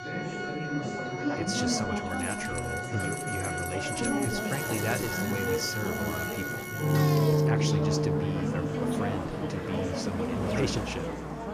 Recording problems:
background music; very loud; throughout; 3 dB above the speech
chatter from many people; very loud; throughout; 1 dB above the speech
traffic noise; loud; from 4.5 s on; 4 dB below the speech
jangling keys; noticeable; from 2 to 5 s; peak 1 dB below the speech

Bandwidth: 14.5 kHz